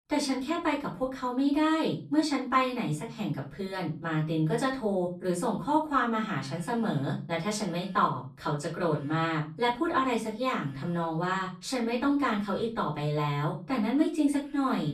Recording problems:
off-mic speech; far
room echo; slight; dies away in 0.4 s

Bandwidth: 14.5 kHz